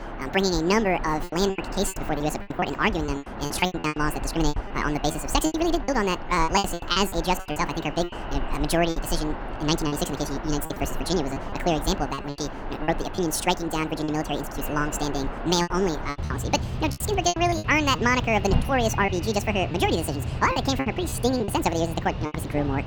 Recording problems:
wrong speed and pitch; too fast and too high; 1.7 times normal speed
echo of what is said; faint; throughout; 360 ms later, 25 dB below the speech
animal sounds; loud; throughout; 8 dB below the speech
background chatter; faint; throughout; 4 voices, 30 dB below the speech
choppy; very; 12% of the speech affected

